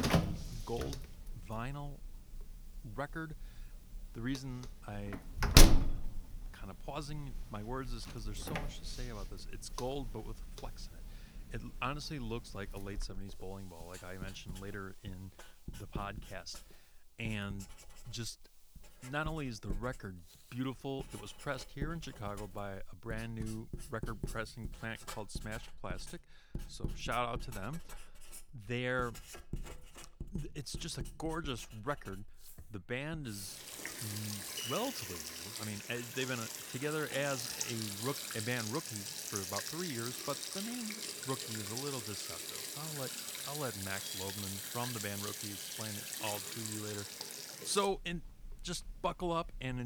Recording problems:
household noises; very loud; throughout; 2 dB above the speech
hiss; faint; until 26 s; 25 dB below the speech
abrupt cut into speech; at the end

